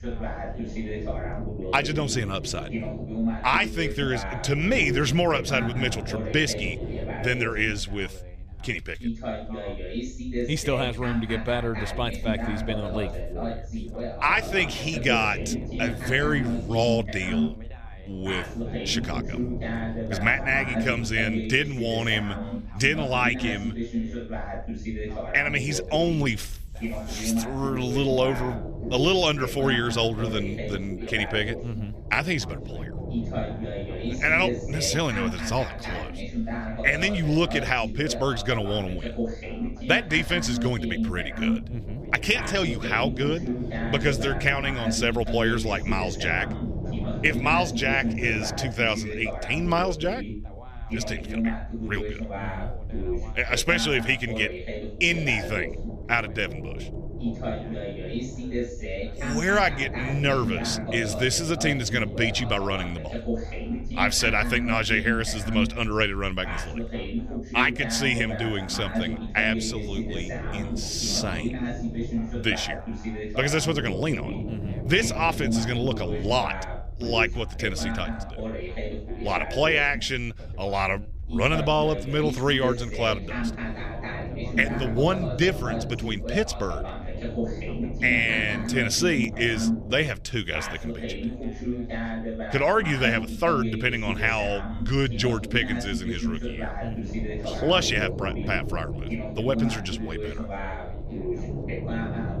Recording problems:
background chatter; loud; throughout; 2 voices, 7 dB below the speech
low rumble; noticeable; throughout; 20 dB below the speech

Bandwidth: 14.5 kHz